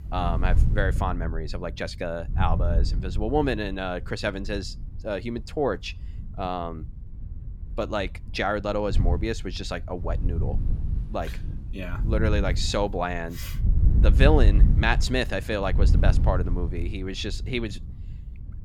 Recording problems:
wind noise on the microphone; occasional gusts; 15 dB below the speech

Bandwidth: 17.5 kHz